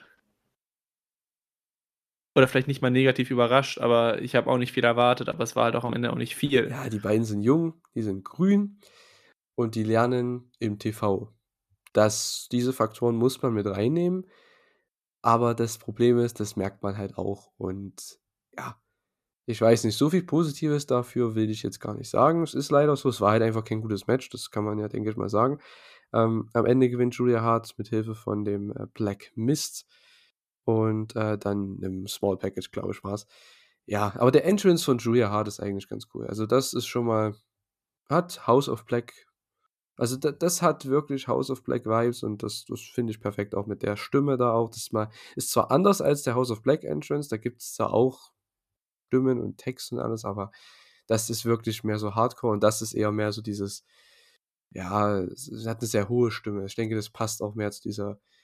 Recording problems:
none

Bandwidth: 14.5 kHz